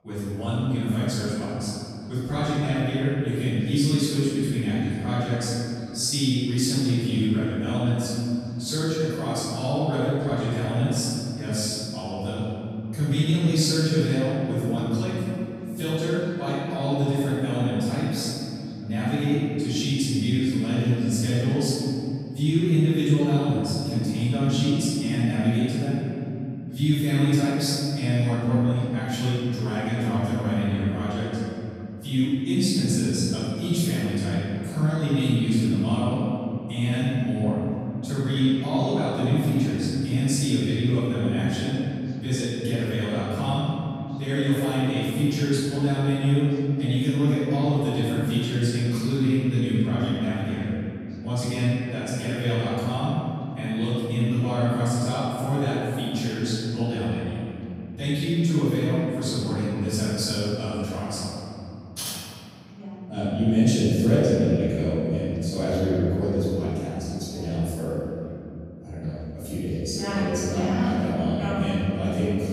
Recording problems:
room echo; strong; dies away in 2.9 s
off-mic speech; far
voice in the background; faint; throughout; 30 dB below the speech

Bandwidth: 15.5 kHz